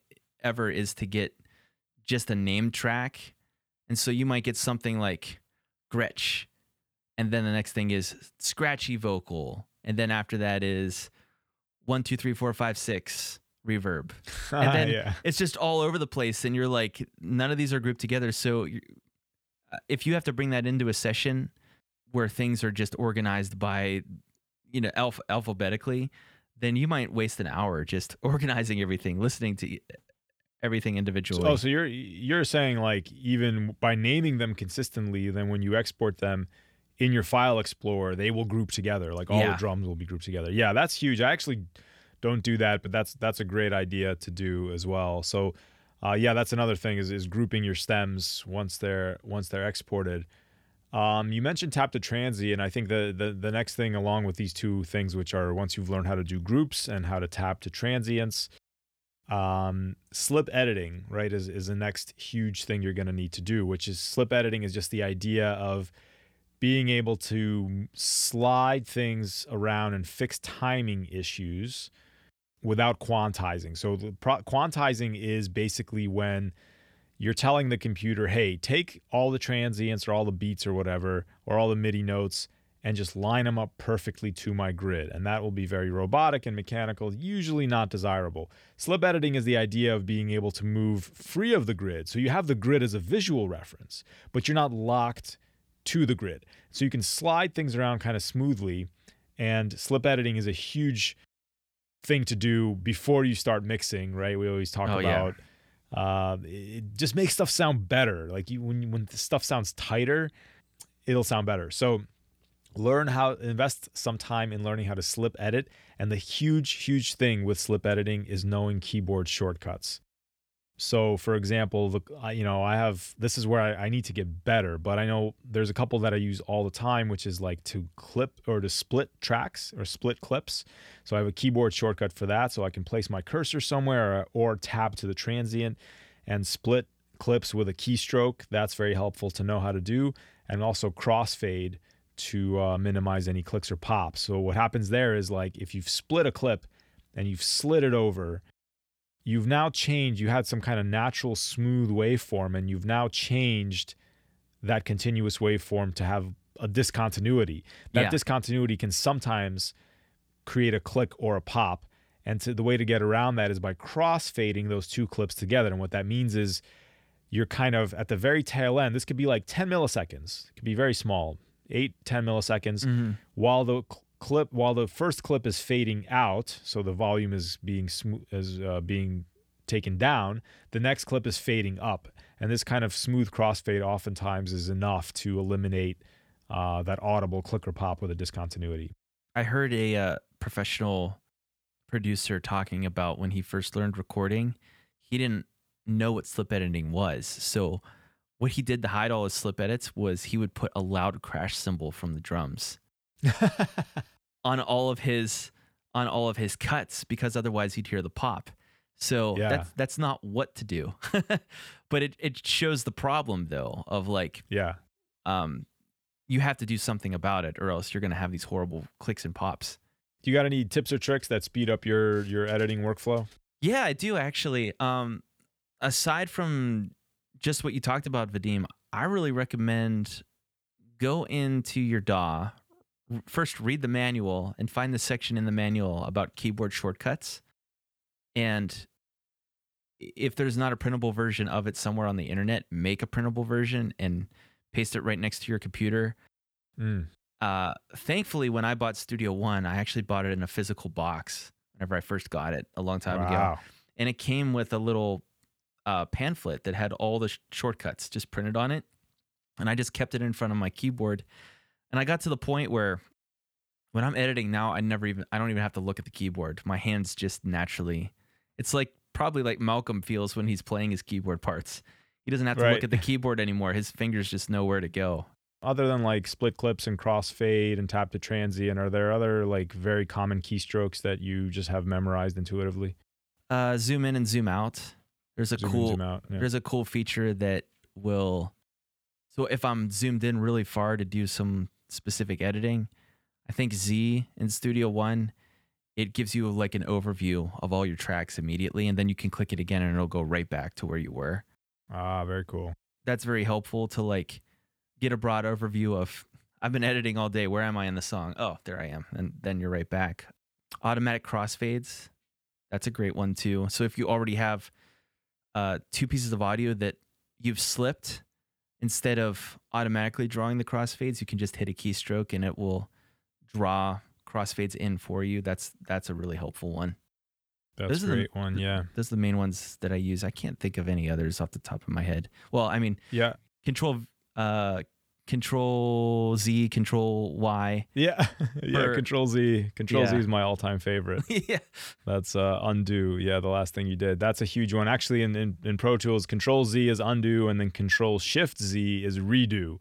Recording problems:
none

